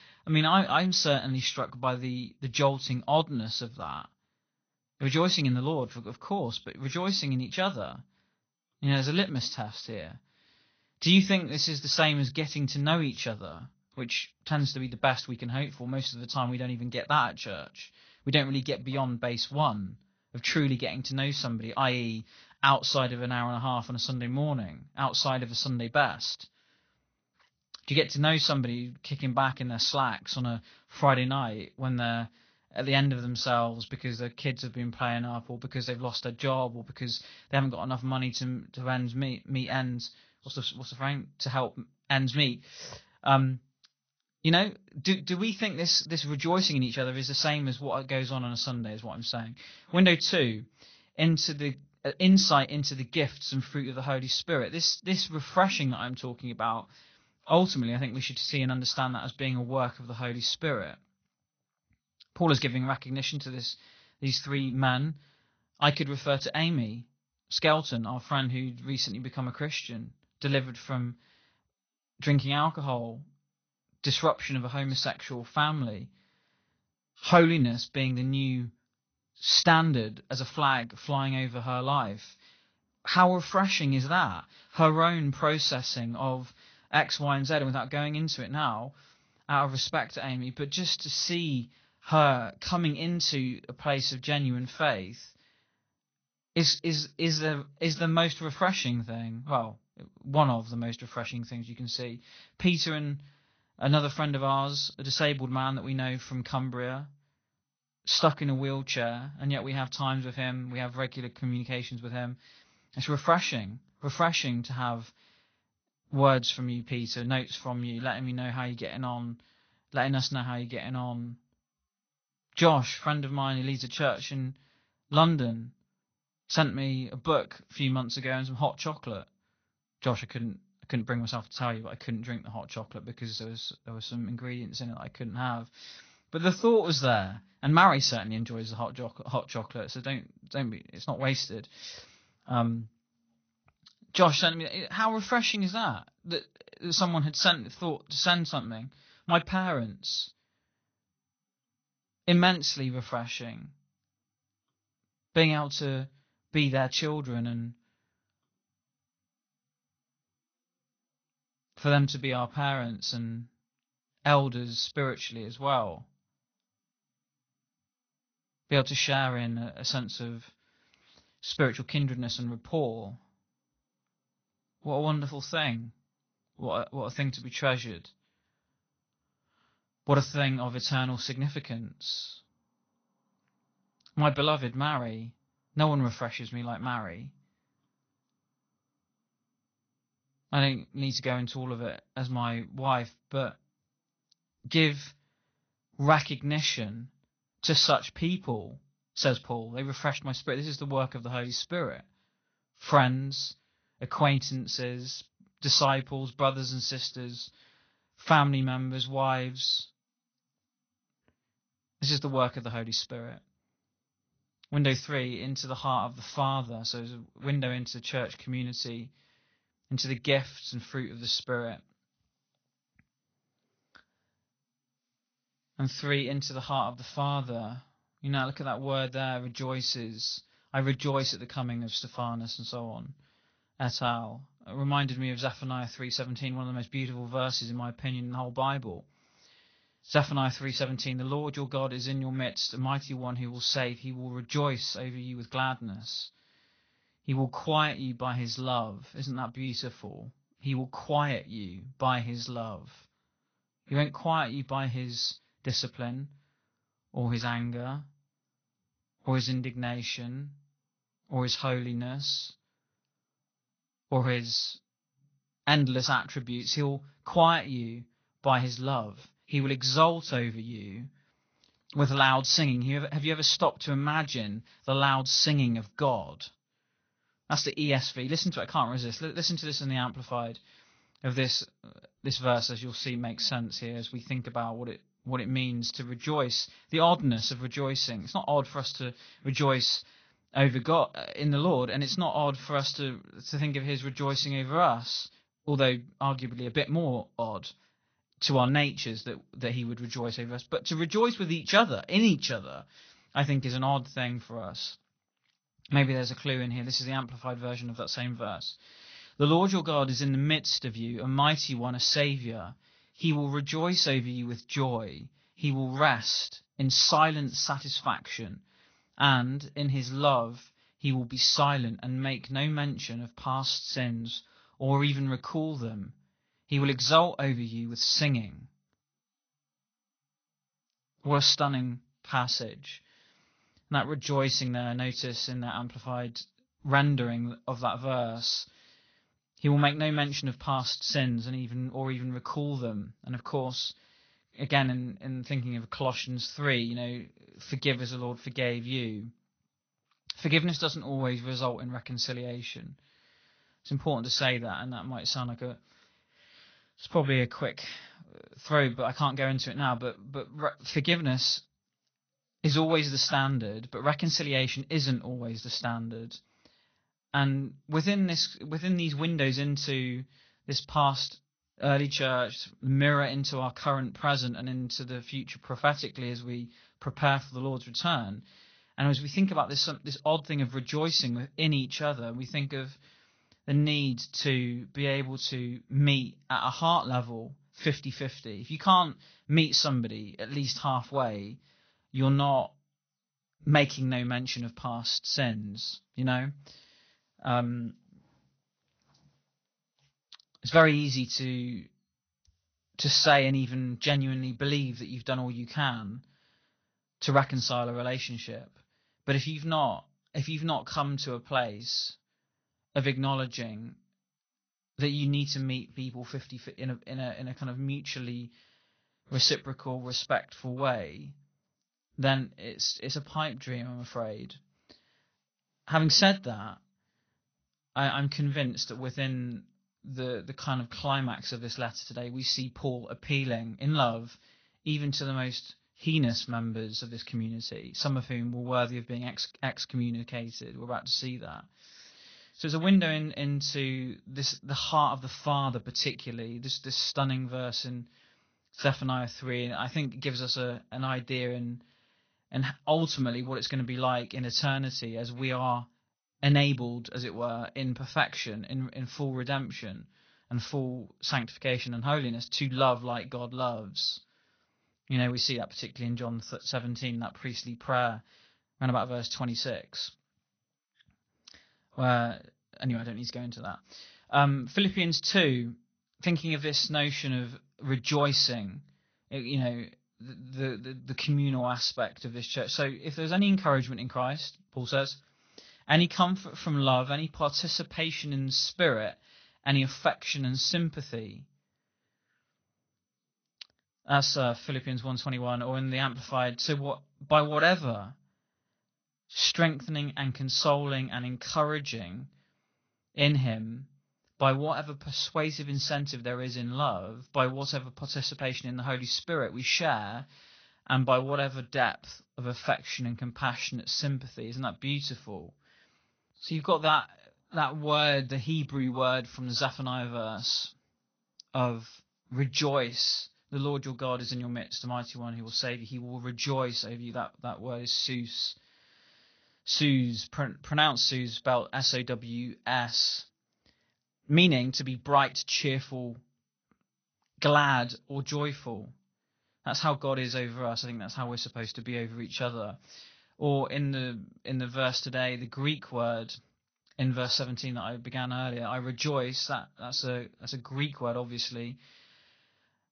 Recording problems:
garbled, watery; slightly; nothing above 6 kHz
high frequencies cut off; slight

